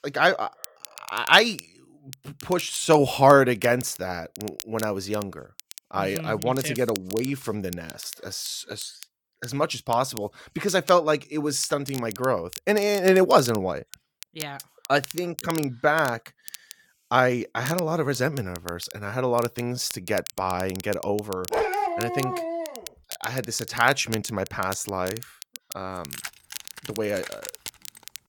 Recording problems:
crackle, like an old record; noticeable; 15 dB below the speech
dog barking; noticeable; from 22 to 23 s; peak level with the speech
jangling keys; faint; from 26 s on; peak 10 dB below the speech

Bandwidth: 18 kHz